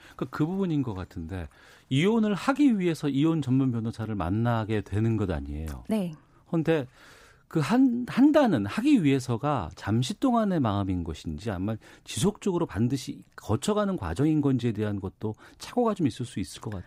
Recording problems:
none

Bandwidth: 15.5 kHz